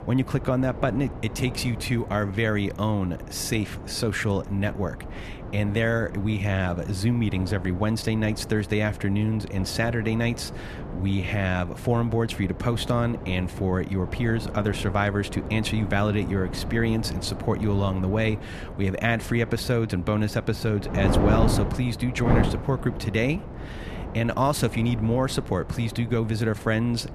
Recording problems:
wind noise on the microphone; heavy; 10 dB below the speech

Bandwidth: 14 kHz